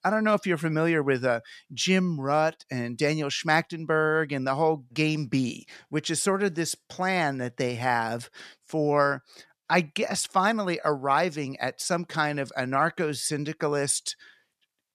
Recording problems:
none

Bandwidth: 14 kHz